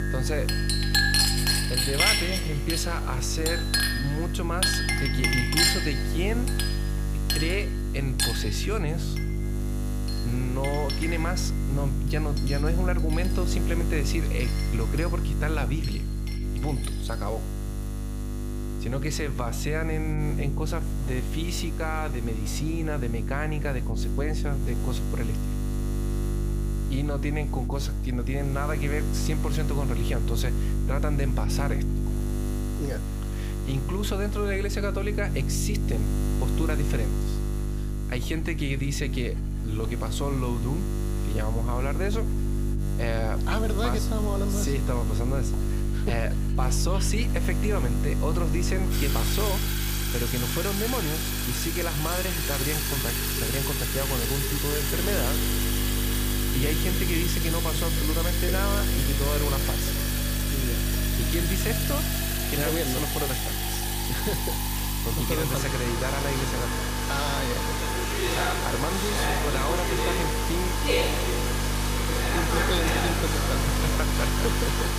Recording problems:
household noises; very loud; throughout; 4 dB above the speech
electrical hum; loud; throughout; 50 Hz, 6 dB below the speech

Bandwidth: 15 kHz